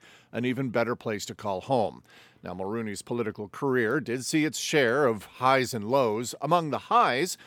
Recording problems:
none

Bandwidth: 18.5 kHz